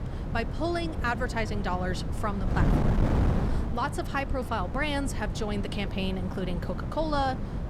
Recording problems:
wind noise on the microphone; heavy; 7 dB below the speech

